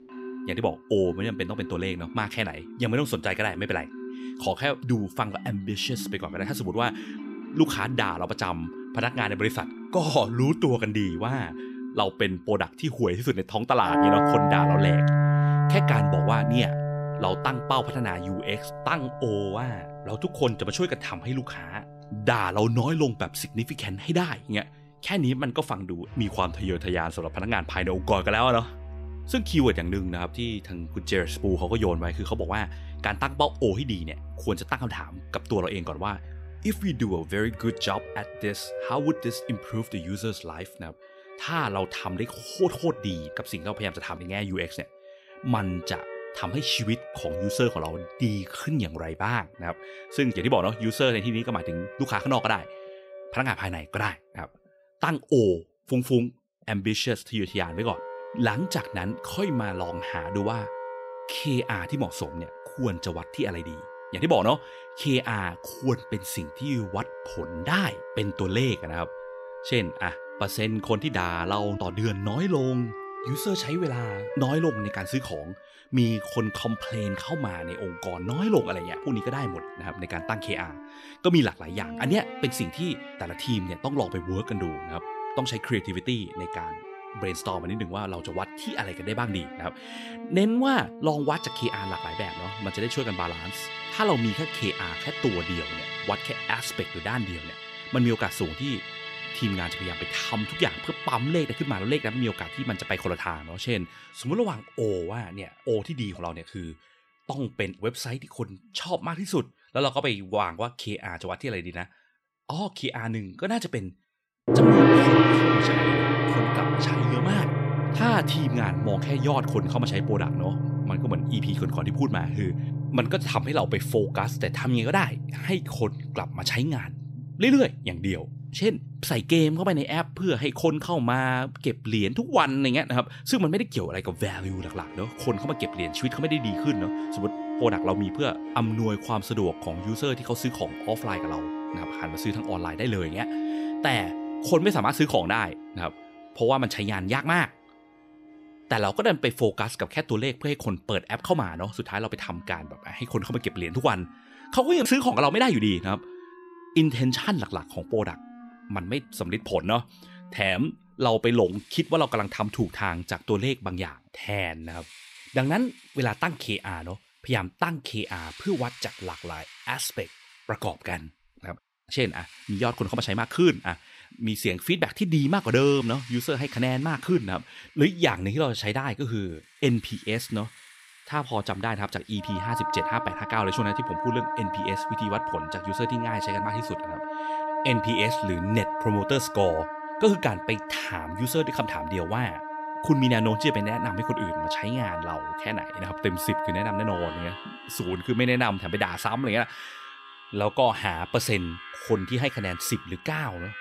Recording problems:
background music; loud; throughout; 3 dB below the speech

